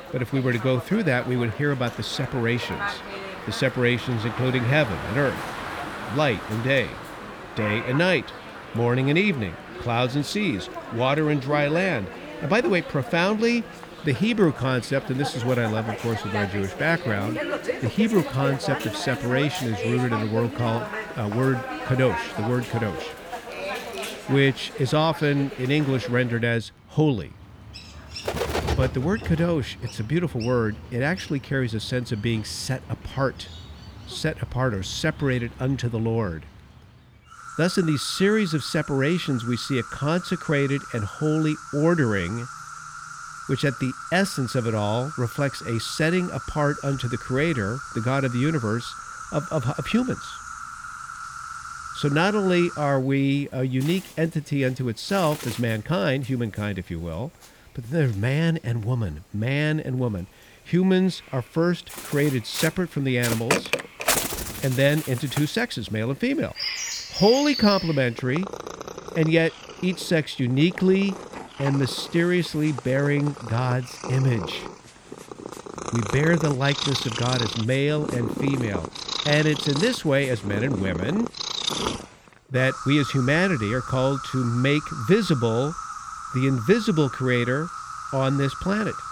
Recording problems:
animal sounds; loud; throughout; 9 dB below the speech

